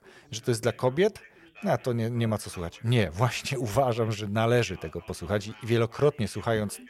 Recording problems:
background chatter; faint; throughout; 3 voices, 25 dB below the speech

